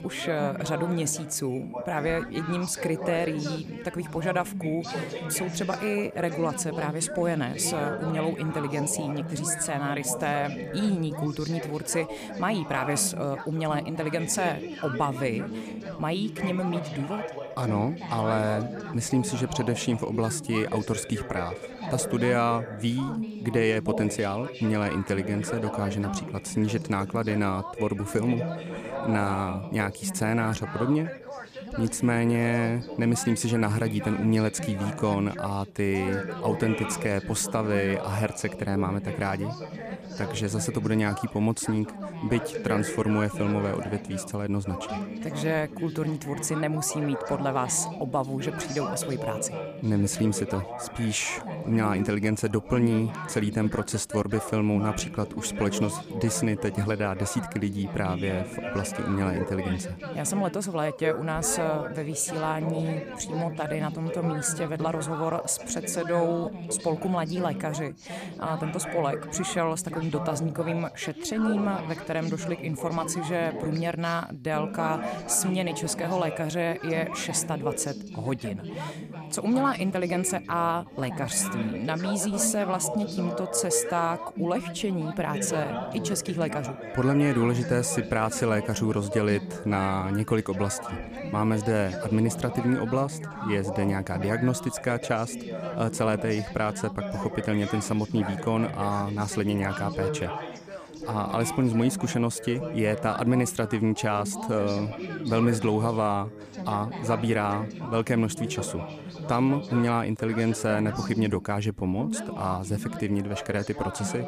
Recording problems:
background chatter; loud; throughout; 3 voices, 7 dB below the speech

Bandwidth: 14.5 kHz